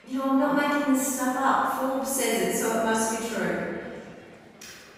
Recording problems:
room echo; strong; dies away in 1.7 s
off-mic speech; far
murmuring crowd; faint; throughout; 25 dB below the speech

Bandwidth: 15.5 kHz